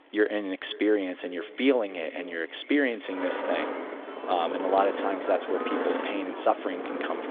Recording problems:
echo of what is said; faint; throughout; 520 ms later, 20 dB below the speech
phone-call audio; nothing above 3.5 kHz
traffic noise; loud; throughout; 4 dB below the speech

